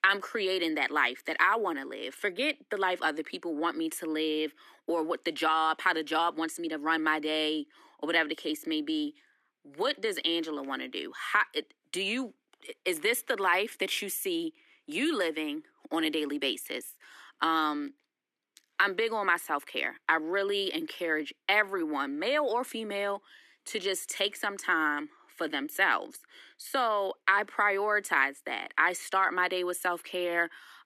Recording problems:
thin; somewhat; fading below 300 Hz

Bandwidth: 14 kHz